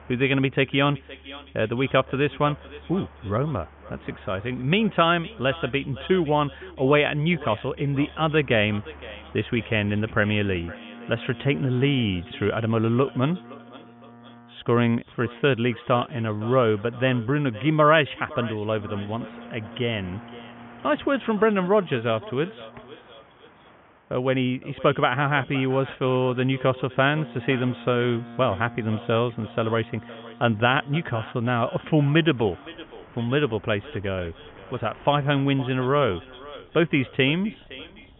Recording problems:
high frequencies cut off; severe; nothing above 3.5 kHz
echo of what is said; faint; throughout; 510 ms later, 20 dB below the speech
train or aircraft noise; faint; throughout; 25 dB below the speech

